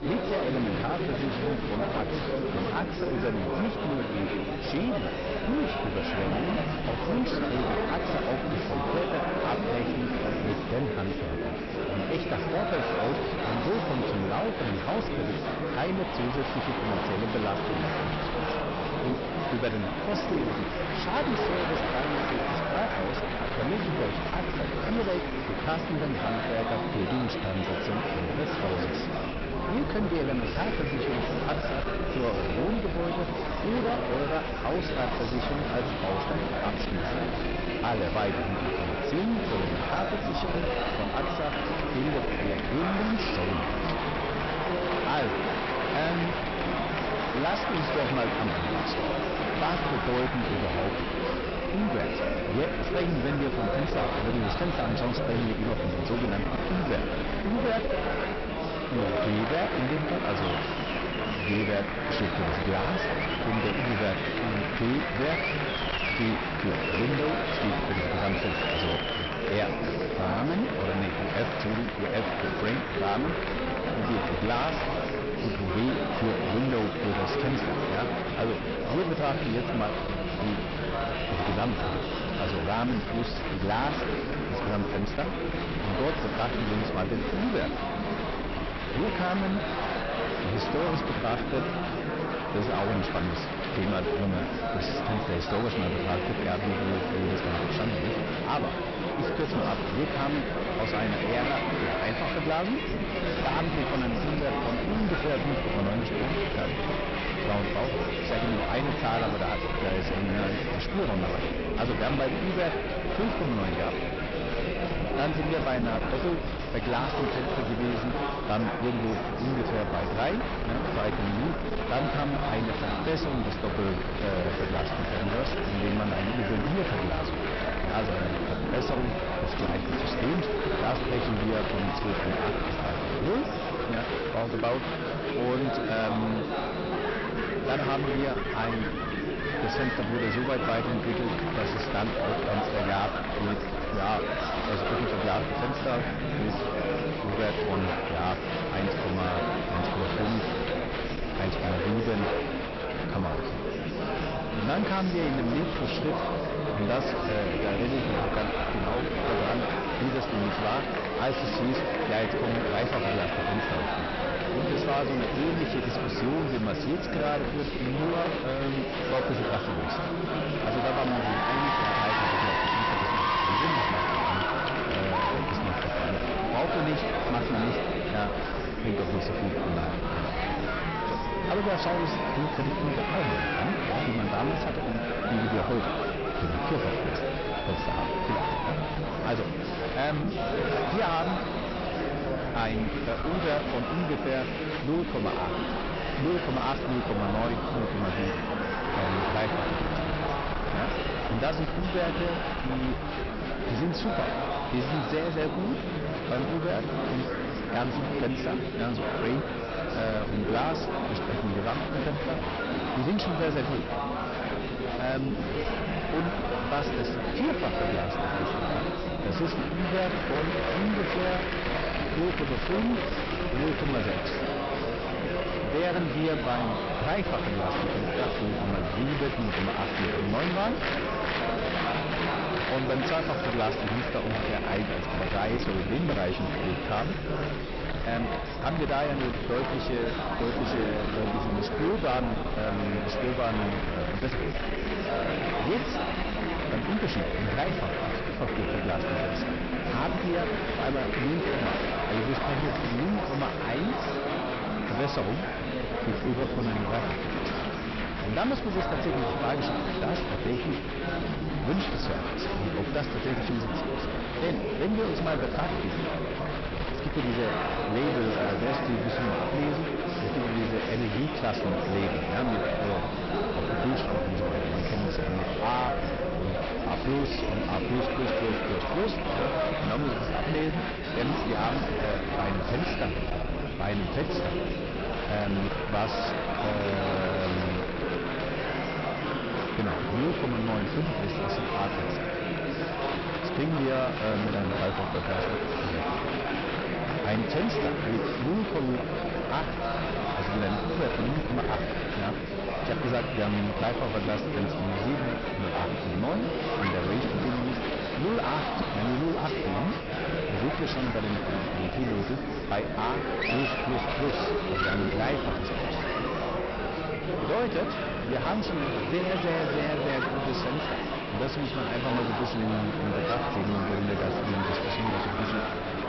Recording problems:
distortion; heavy; 21% of the sound clipped
high frequencies cut off; noticeable; nothing above 5.5 kHz
murmuring crowd; very loud; throughout; 1 dB above the speech
low rumble; noticeable; throughout; 15 dB below the speech
hiss; faint; throughout; 25 dB below the speech

